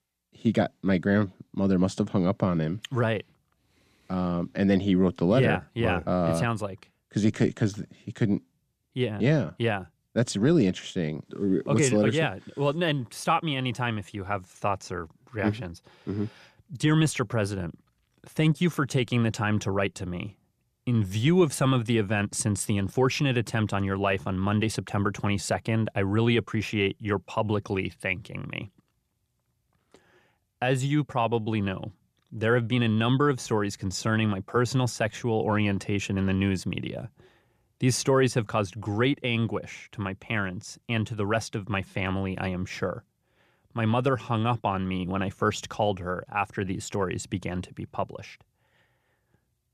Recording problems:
none

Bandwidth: 14.5 kHz